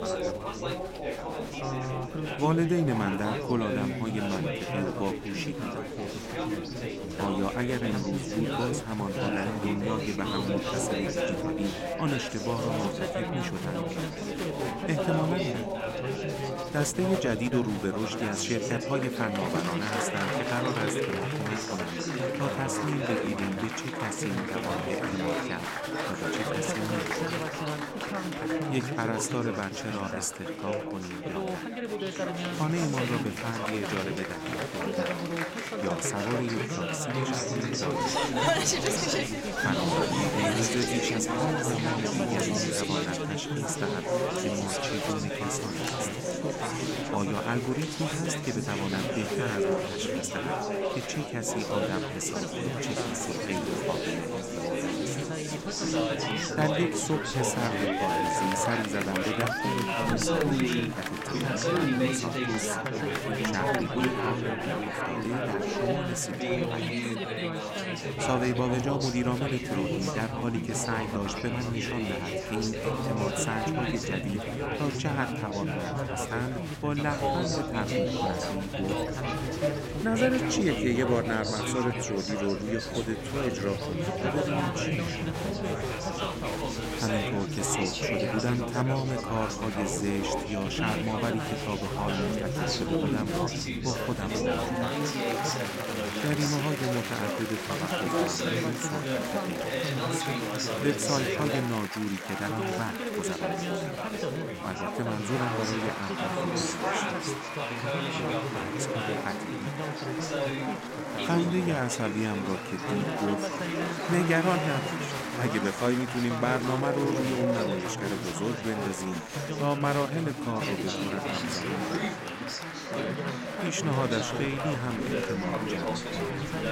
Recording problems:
chatter from many people; very loud; throughout; 2 dB above the speech

